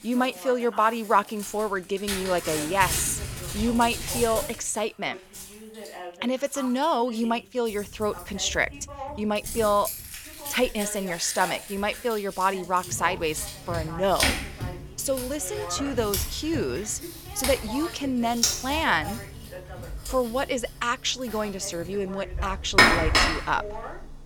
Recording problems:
household noises; loud; throughout; 2 dB below the speech
voice in the background; noticeable; throughout; 15 dB below the speech

